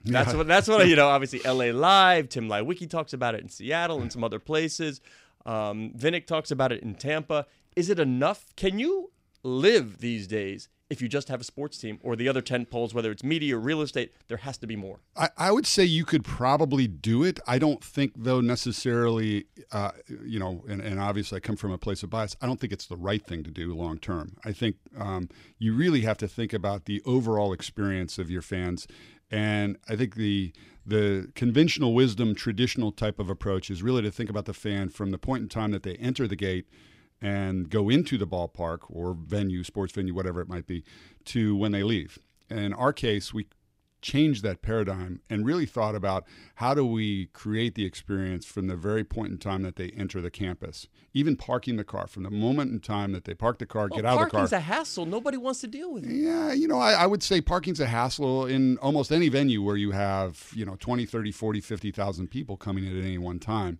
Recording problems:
none

